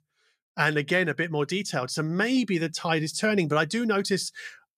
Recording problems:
none

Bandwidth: 14.5 kHz